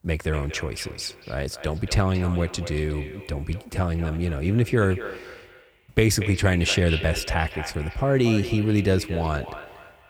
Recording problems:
echo of what is said; noticeable; throughout; 230 ms later, 10 dB below the speech

